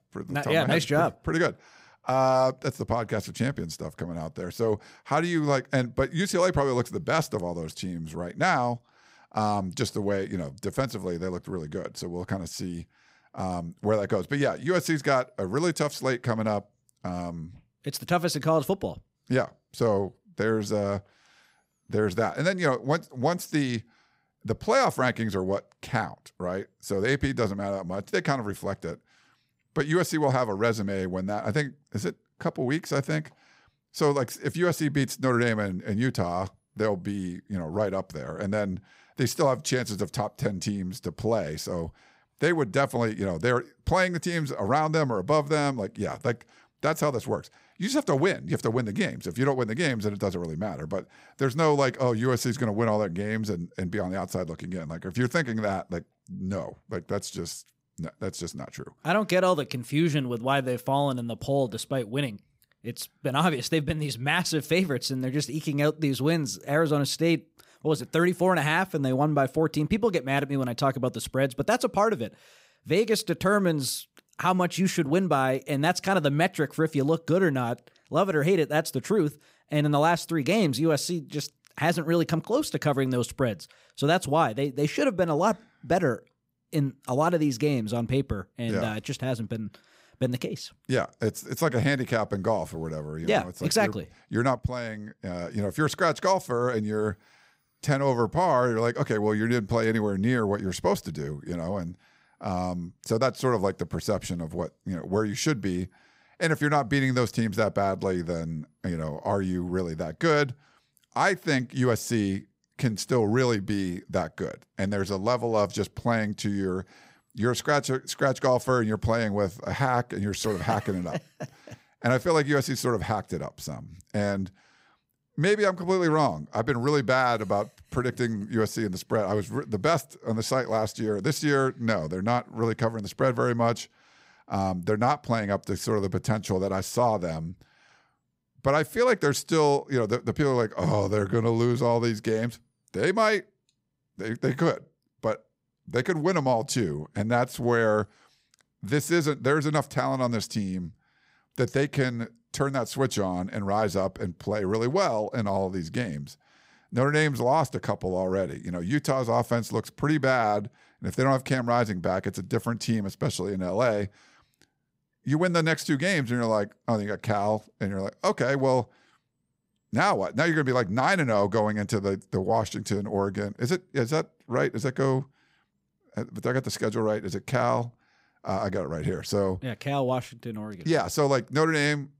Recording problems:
none

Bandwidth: 15.5 kHz